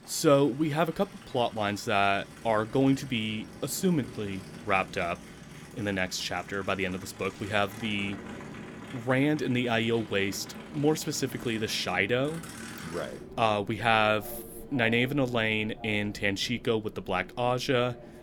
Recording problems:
train or aircraft noise; noticeable; throughout; 15 dB below the speech

